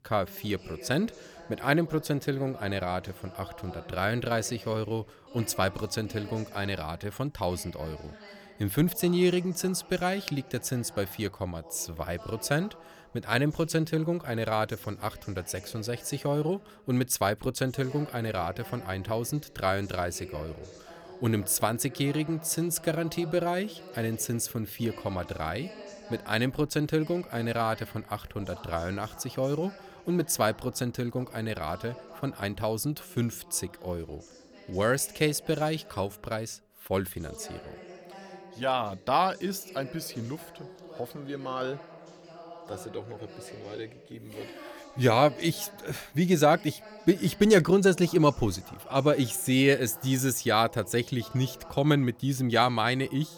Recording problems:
voice in the background; noticeable; throughout; 20 dB below the speech

